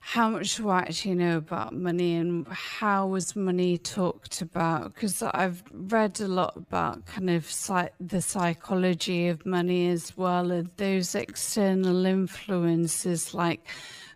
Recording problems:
wrong speed, natural pitch; too slow; 0.5 times normal speed

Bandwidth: 15 kHz